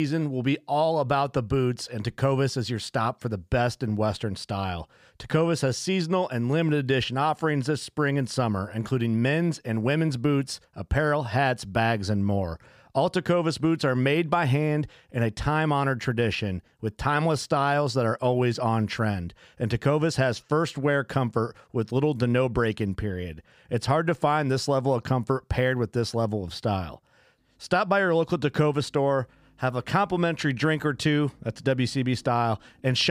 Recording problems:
abrupt cut into speech; at the start and the end

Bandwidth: 15 kHz